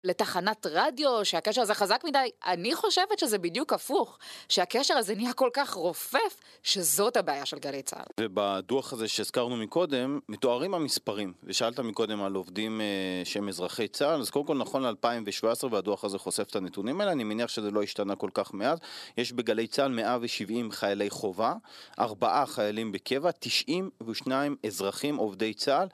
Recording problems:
thin; somewhat; fading below 350 Hz

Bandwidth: 13.5 kHz